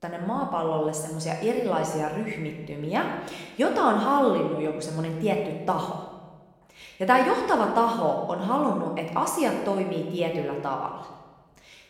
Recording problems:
room echo; noticeable; dies away in 1 s
off-mic speech; somewhat distant

